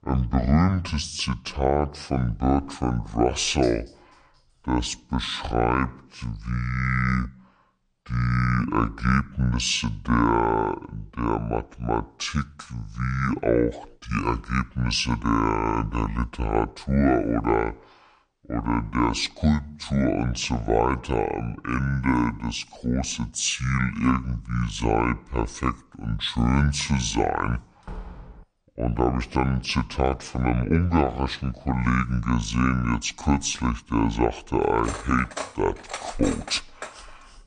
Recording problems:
wrong speed and pitch; too slow and too low; 0.6 times normal speed
clattering dishes; faint; from 3.5 to 4.5 s; peak 20 dB below the speech
door banging; faint; at 28 s; peak 15 dB below the speech
clattering dishes; noticeable; from 35 to 37 s; peak 10 dB below the speech

